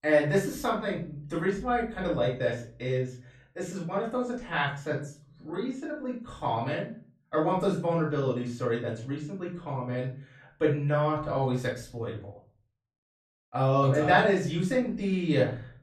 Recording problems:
off-mic speech; far
room echo; slight; dies away in 0.4 s

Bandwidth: 14 kHz